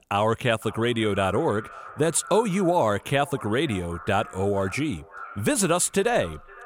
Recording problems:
echo of what is said; faint; throughout; 510 ms later, 20 dB below the speech

